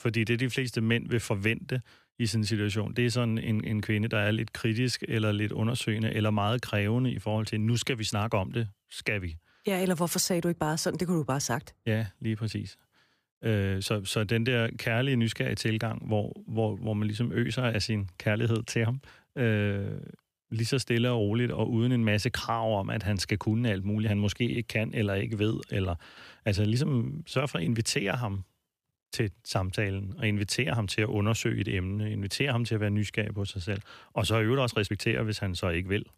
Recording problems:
none

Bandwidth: 15 kHz